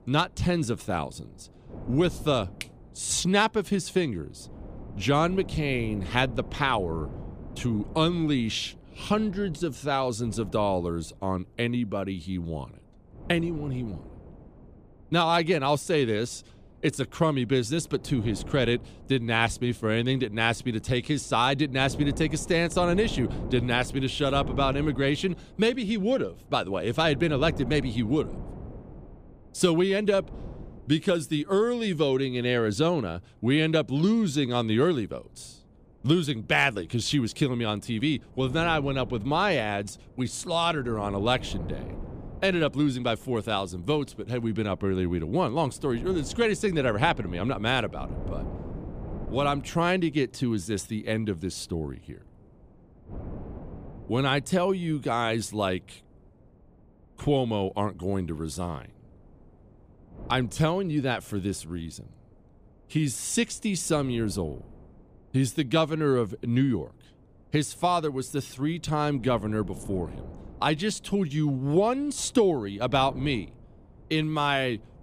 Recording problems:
wind noise on the microphone; occasional gusts; 20 dB below the speech

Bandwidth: 15 kHz